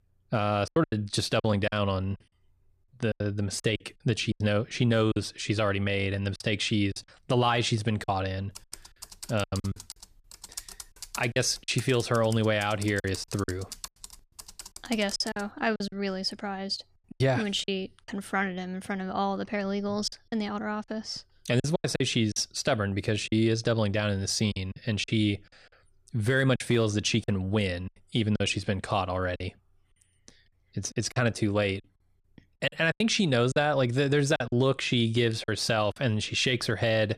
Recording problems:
choppy; very; 8% of the speech affected
keyboard typing; faint; from 8.5 to 15 s; peak 10 dB below the speech

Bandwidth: 14.5 kHz